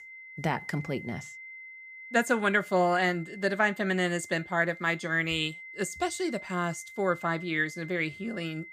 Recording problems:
high-pitched whine; noticeable; throughout; 2 kHz, 15 dB below the speech

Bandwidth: 15 kHz